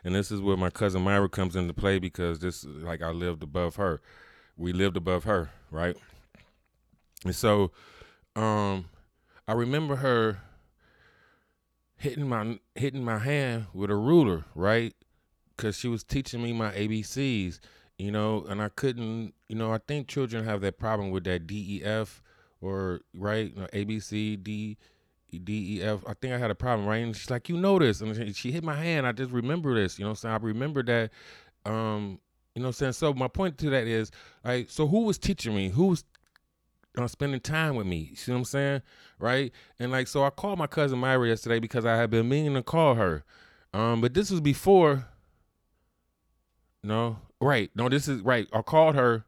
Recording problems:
none

